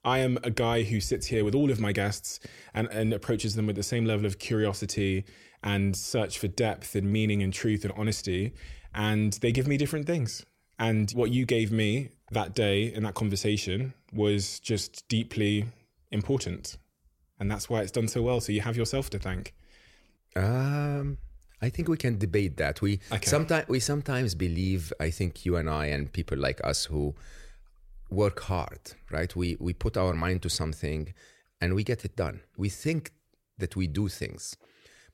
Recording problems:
none

